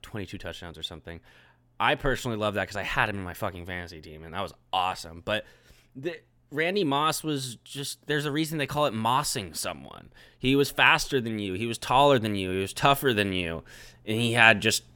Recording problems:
none

